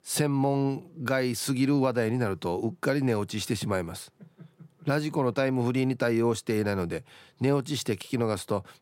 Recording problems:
none

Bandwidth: 16 kHz